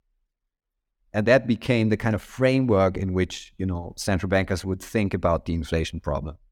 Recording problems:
none

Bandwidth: 18 kHz